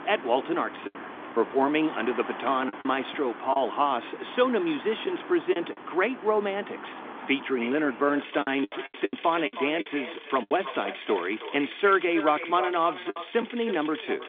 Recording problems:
echo of what is said; strong; from 7 s on; 320 ms later, 10 dB below the speech
phone-call audio; nothing above 3.5 kHz
traffic noise; noticeable; throughout; 15 dB below the speech
choppy; very; 6% of the speech affected

